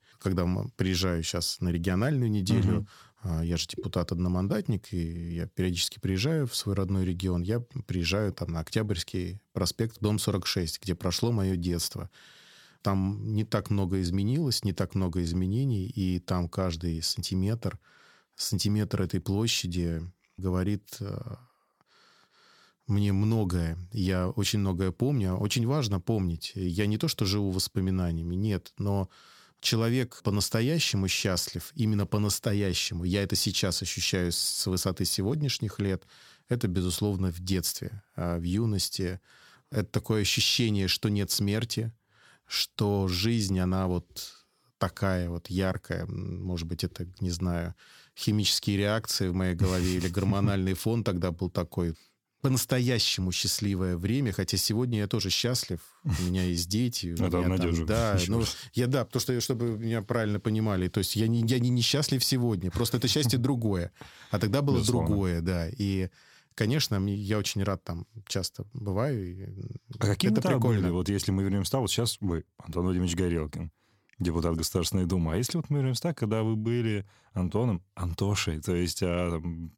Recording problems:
none

